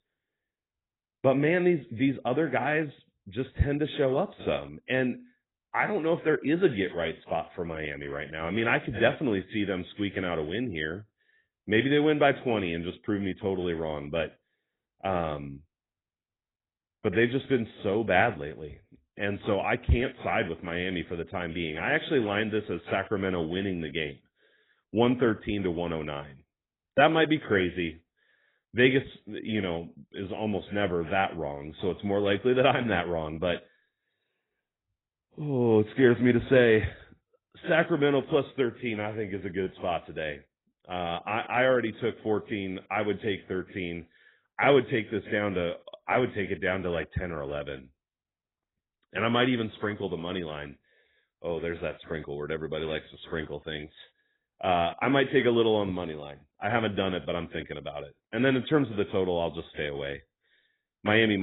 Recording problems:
garbled, watery; badly; nothing above 3.5 kHz
abrupt cut into speech; at the end

